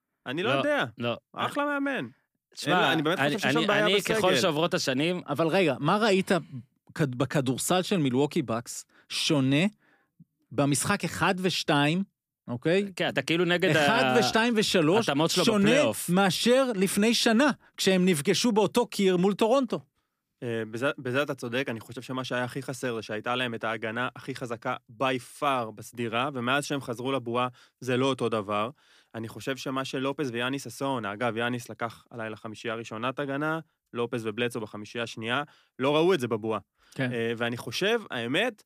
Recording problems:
none

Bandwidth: 15 kHz